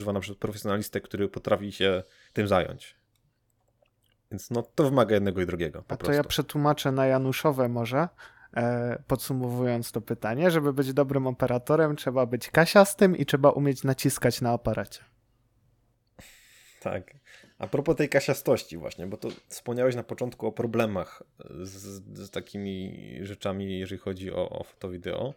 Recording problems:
abrupt cut into speech; at the start

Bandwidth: 17.5 kHz